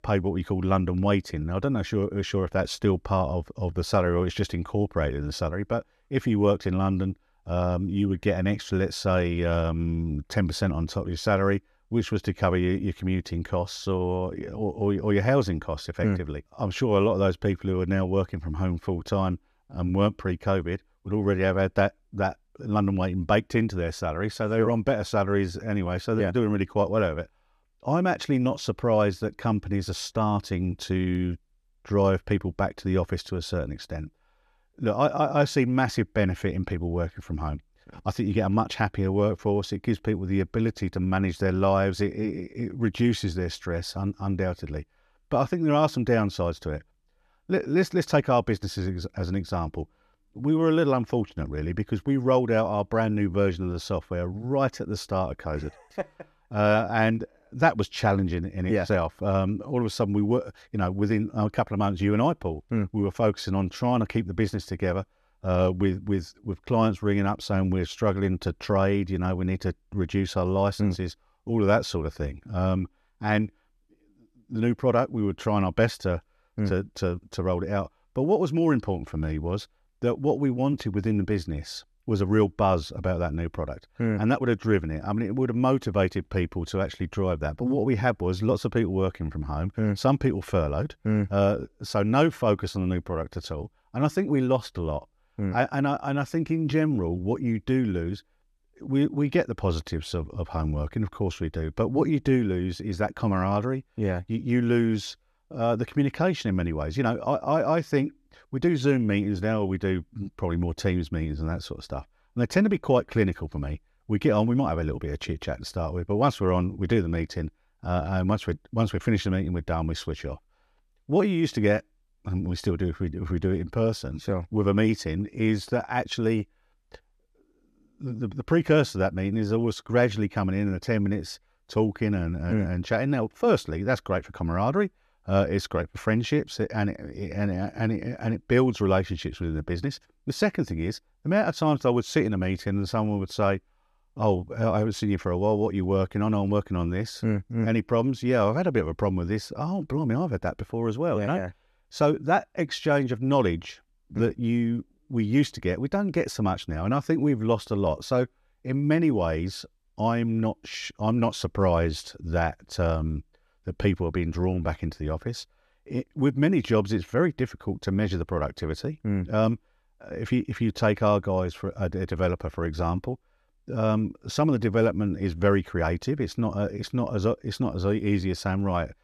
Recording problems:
none

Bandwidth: 13.5 kHz